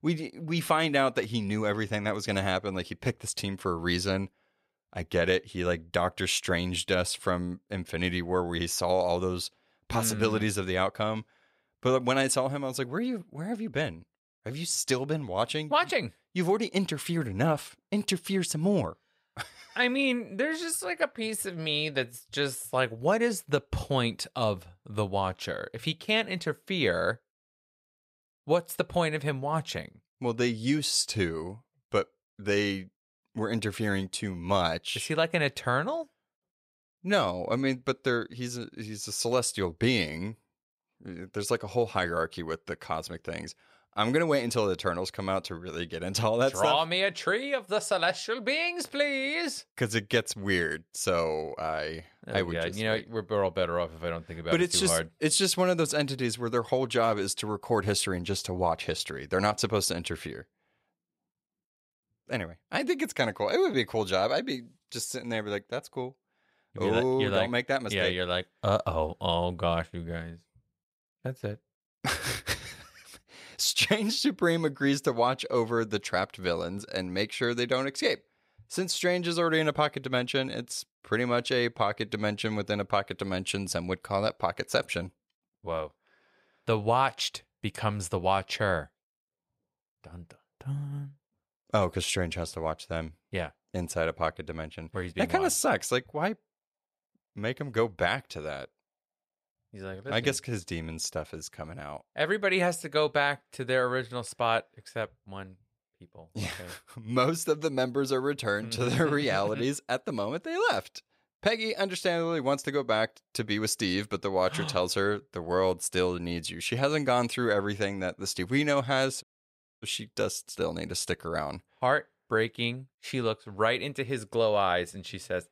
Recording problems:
audio cutting out; at 1:59 for 0.5 s

